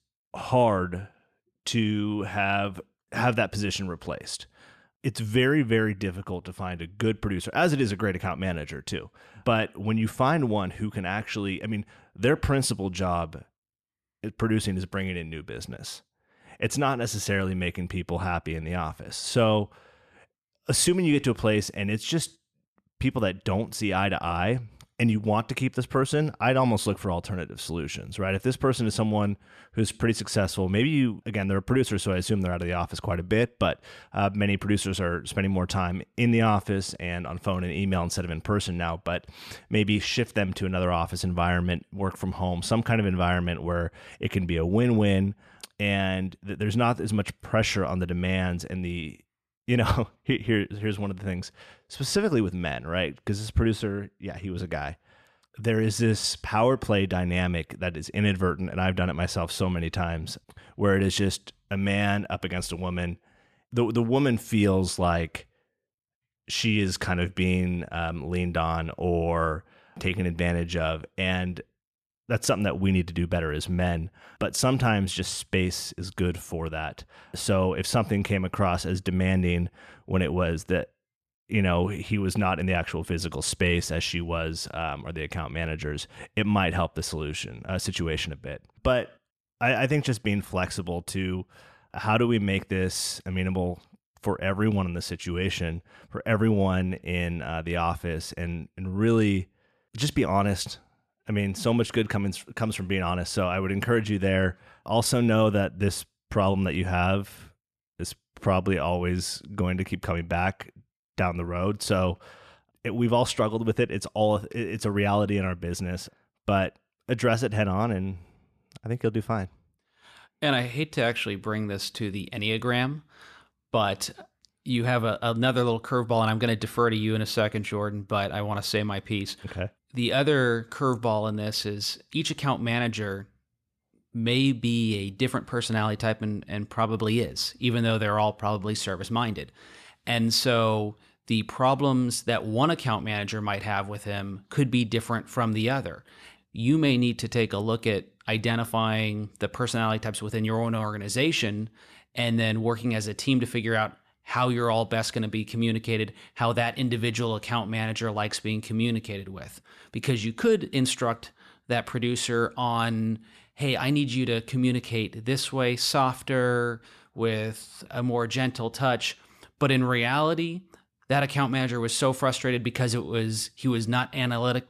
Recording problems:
none

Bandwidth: 14 kHz